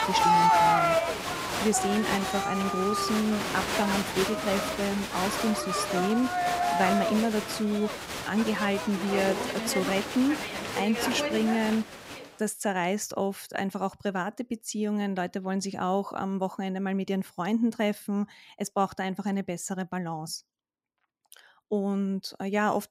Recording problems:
crowd noise; very loud; until 12 s; 1 dB above the speech

